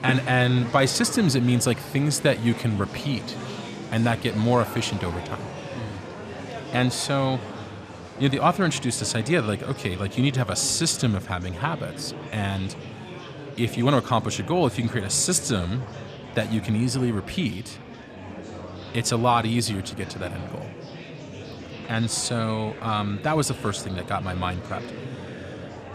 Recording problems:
murmuring crowd; noticeable; throughout; 10 dB below the speech

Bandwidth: 14.5 kHz